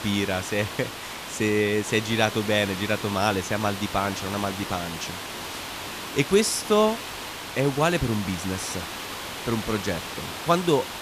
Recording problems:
hiss; loud; throughout; 8 dB below the speech

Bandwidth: 14.5 kHz